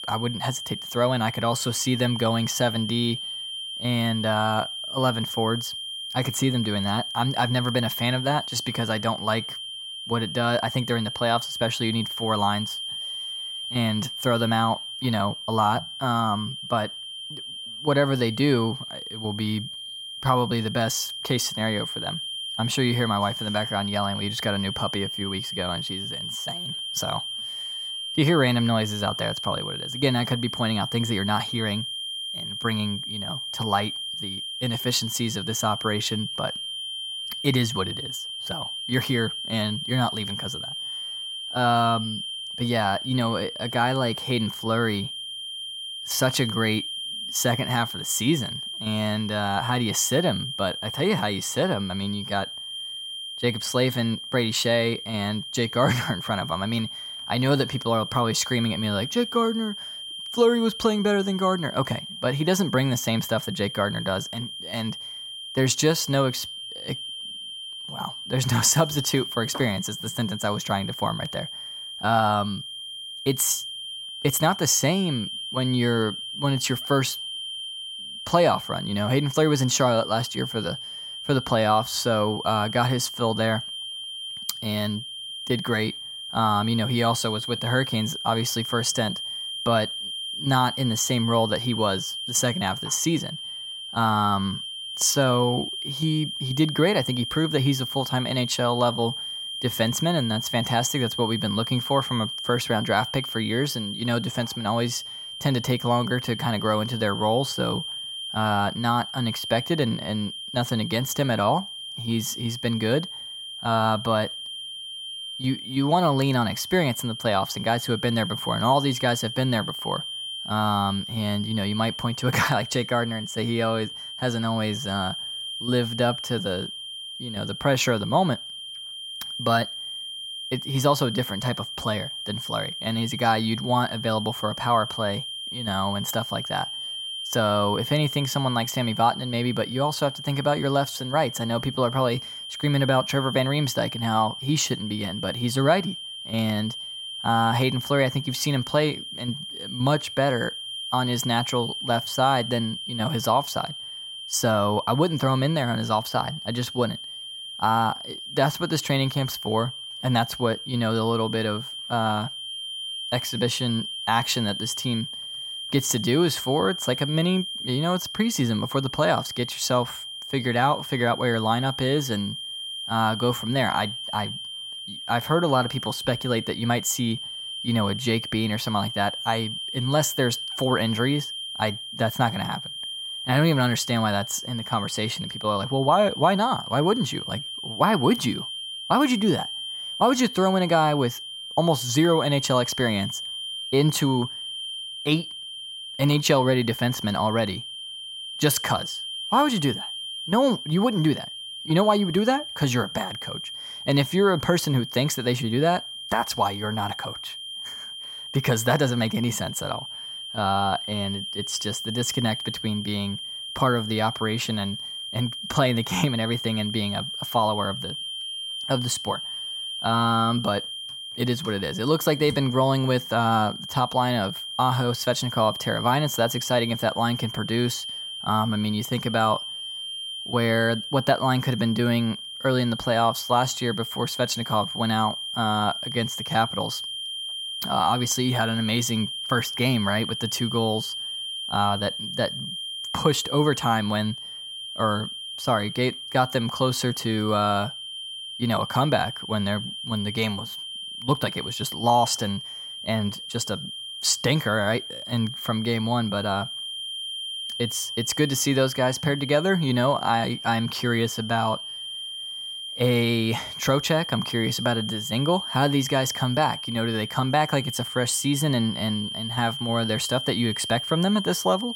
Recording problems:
high-pitched whine; loud; throughout; 3 kHz, 7 dB below the speech

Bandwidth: 16 kHz